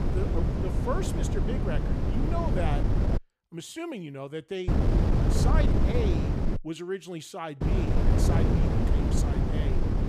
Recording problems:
wind noise on the microphone; heavy; until 3 s, from 4.5 to 6.5 s and from 7.5 s on; 1 dB above the speech

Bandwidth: 15 kHz